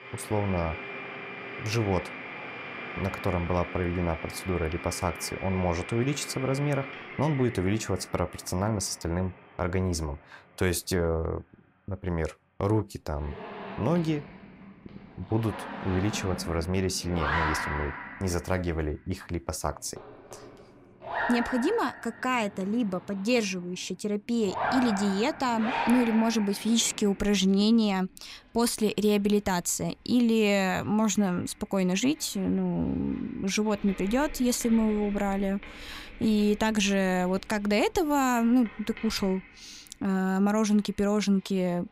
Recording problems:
household noises; loud; throughout; 10 dB below the speech

